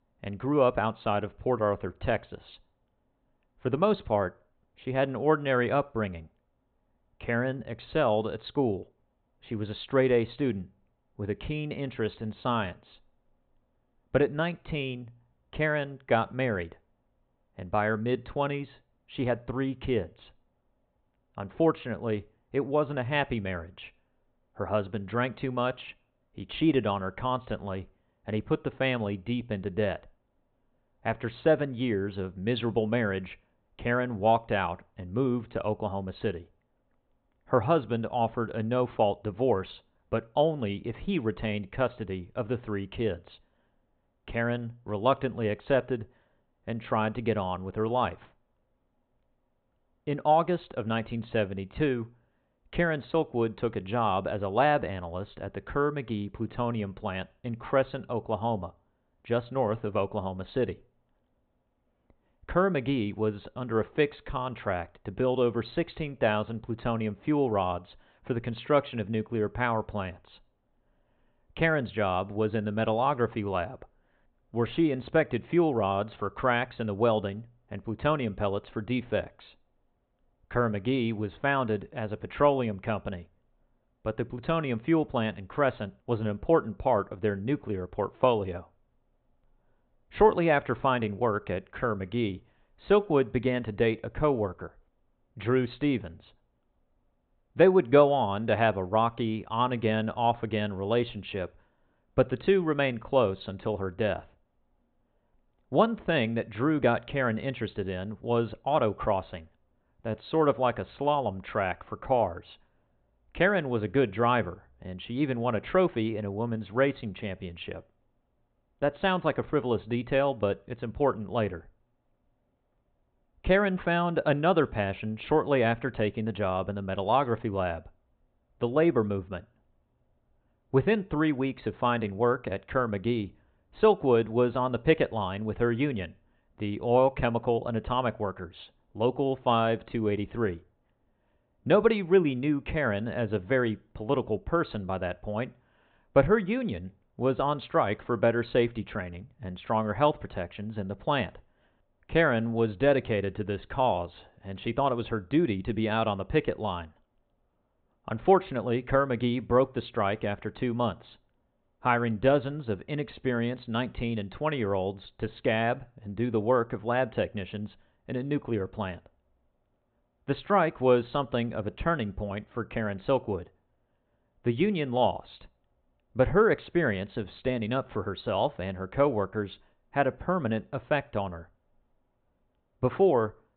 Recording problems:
high frequencies cut off; severe; nothing above 4 kHz

